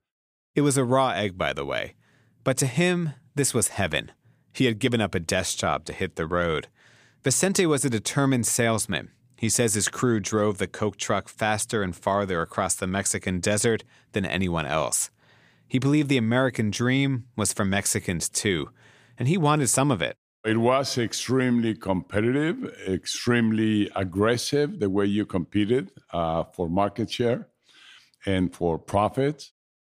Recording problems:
none

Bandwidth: 15 kHz